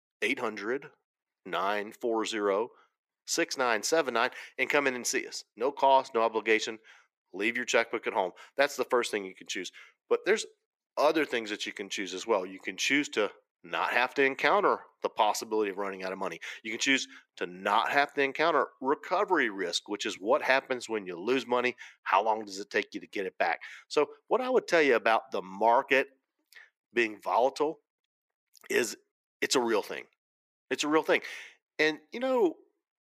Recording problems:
thin; somewhat; fading below 300 Hz

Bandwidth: 15 kHz